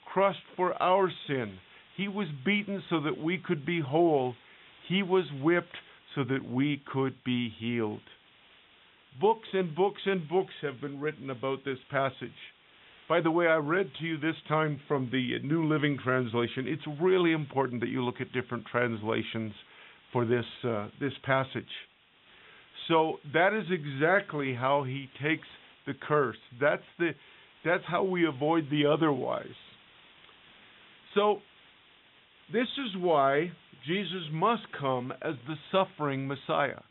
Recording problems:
high frequencies cut off; severe; nothing above 3.5 kHz
hiss; faint; throughout; 25 dB below the speech

